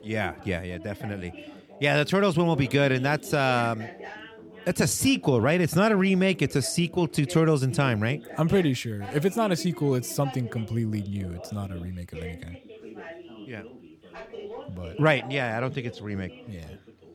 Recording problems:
background chatter; noticeable; throughout; 2 voices, 15 dB below the speech

